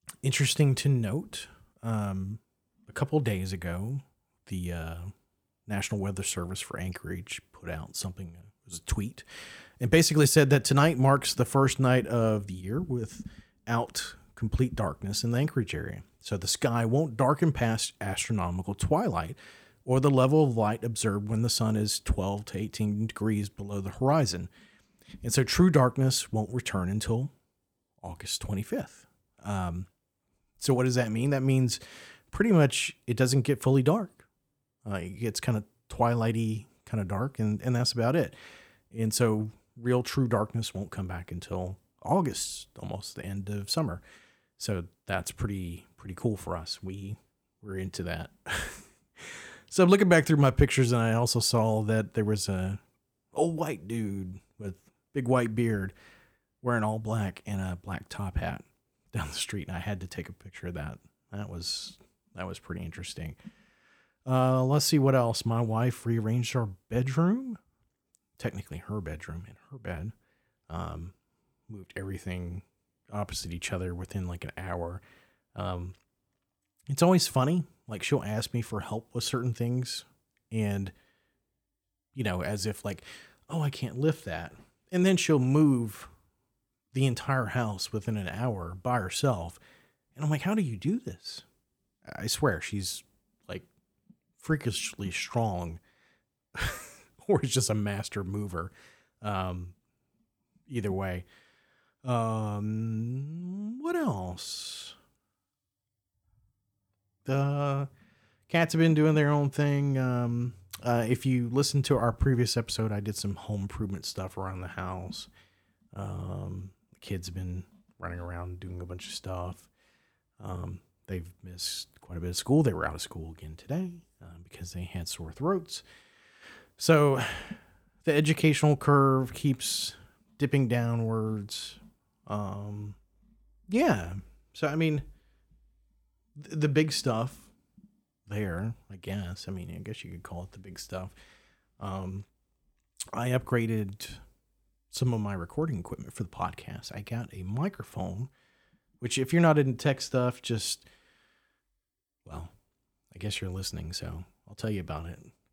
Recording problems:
none

